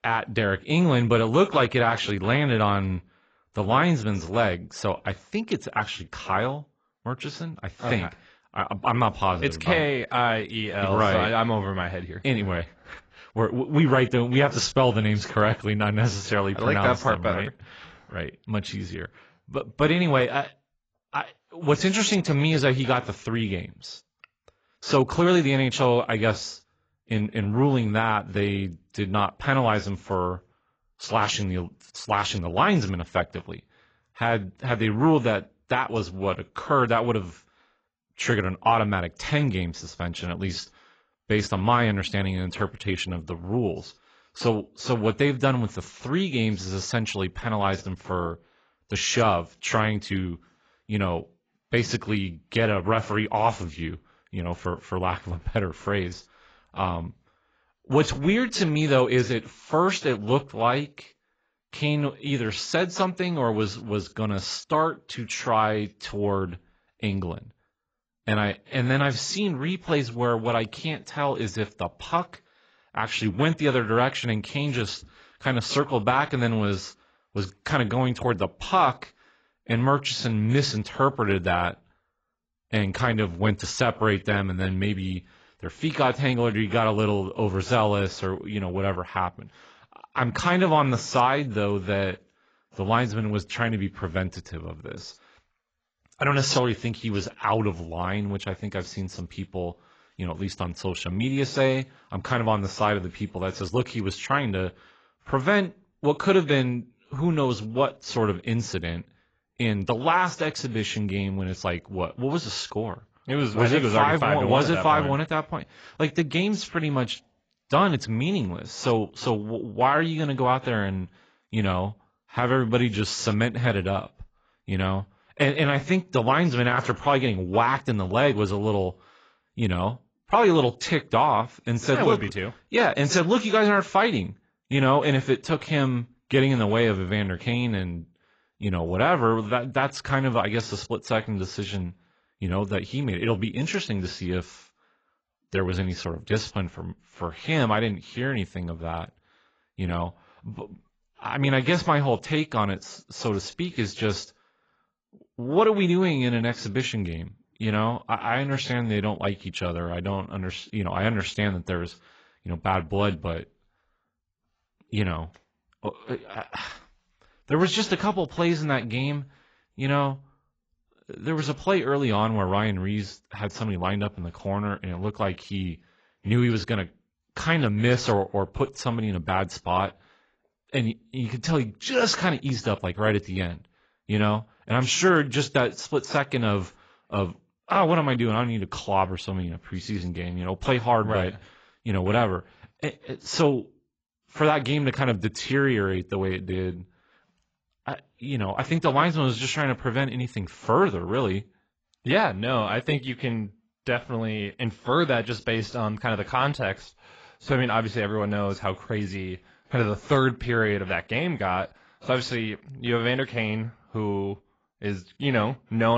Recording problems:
garbled, watery; badly; nothing above 7.5 kHz
abrupt cut into speech; at the end

